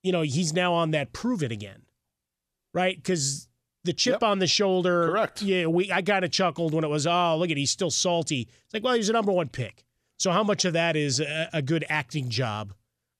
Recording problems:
none

